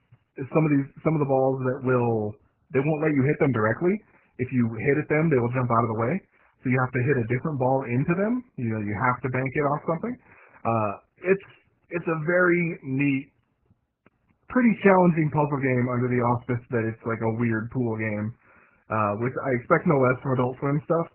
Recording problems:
garbled, watery; badly; nothing above 2.5 kHz

